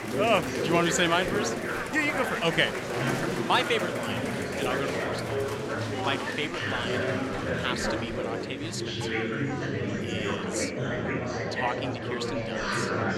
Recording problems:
chatter from many people; loud; throughout; as loud as the speech

